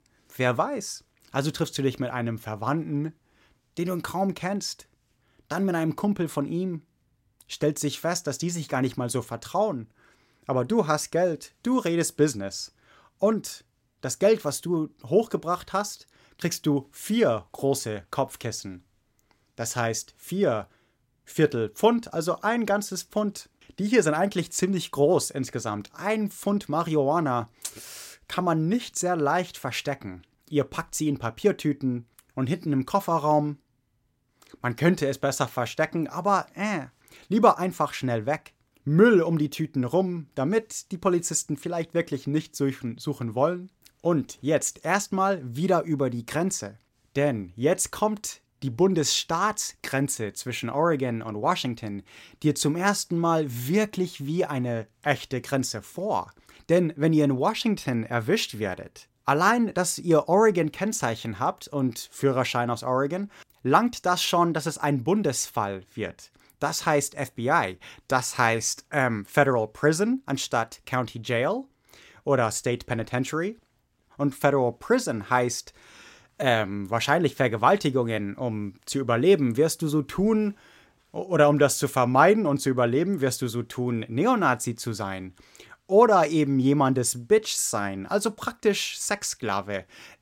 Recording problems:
none

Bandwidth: 16 kHz